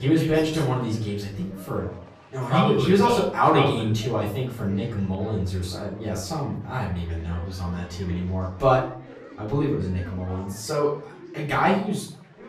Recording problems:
off-mic speech; far
room echo; noticeable; dies away in 0.5 s
chatter from many people; noticeable; throughout; 20 dB below the speech
abrupt cut into speech; at the start

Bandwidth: 14.5 kHz